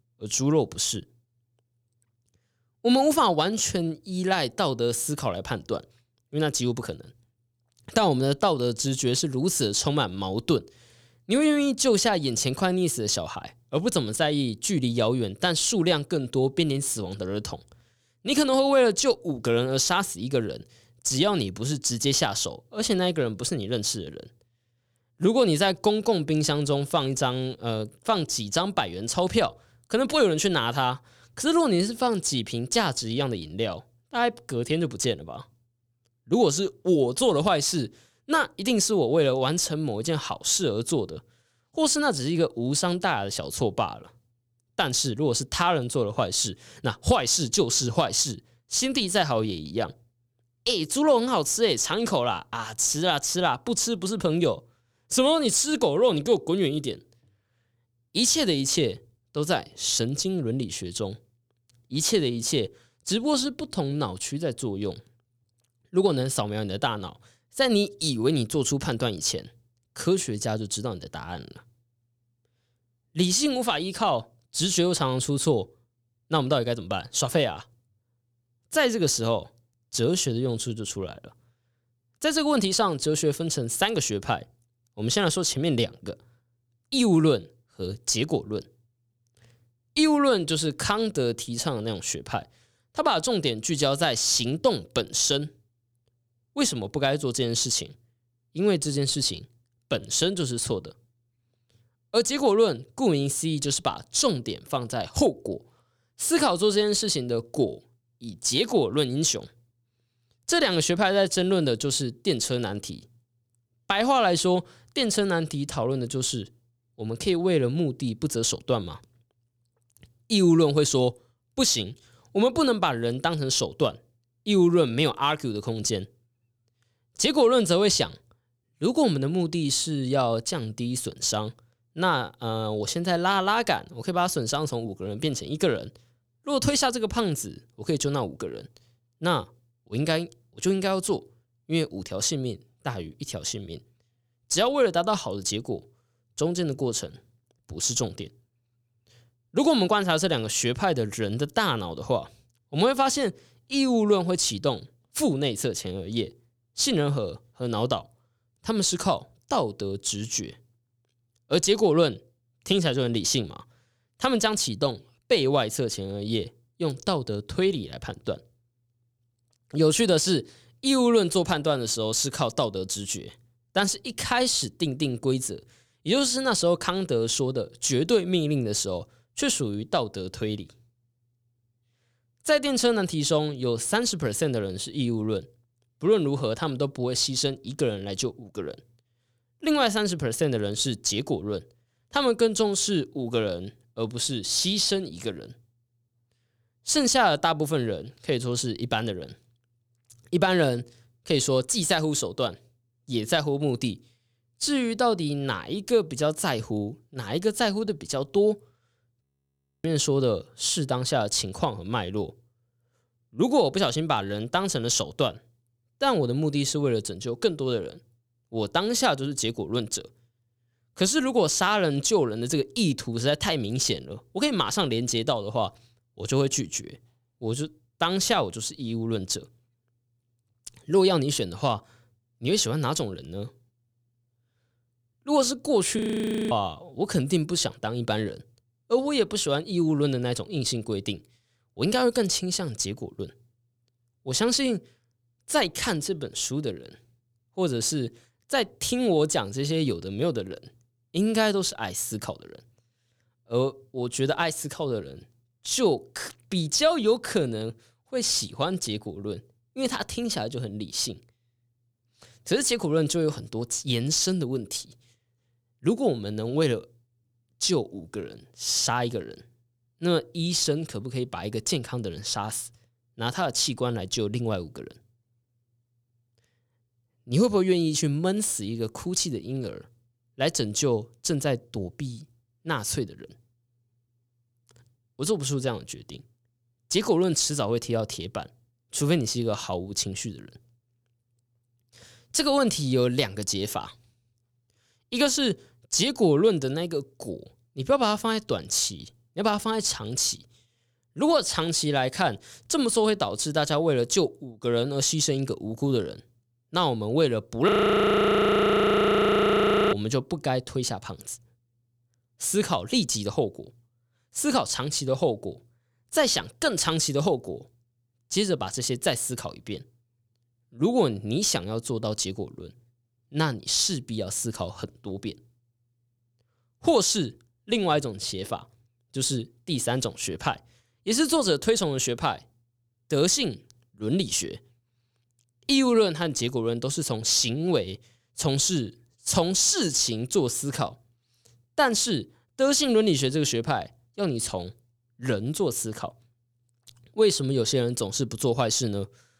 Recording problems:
audio freezing; at 3:29 for 0.5 s, at 3:56 for 0.5 s and at 5:08 for 2 s

